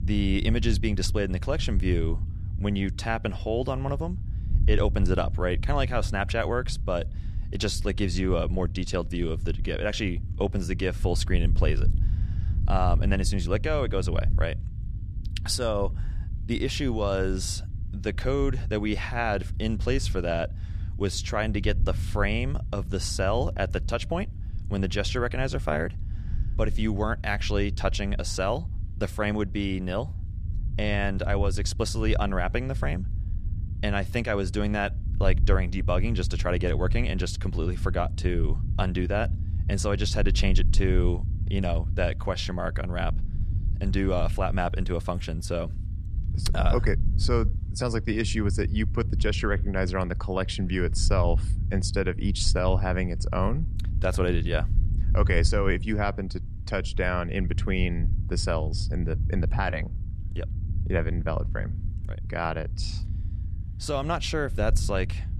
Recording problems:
low rumble; noticeable; throughout; 15 dB below the speech

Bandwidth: 15 kHz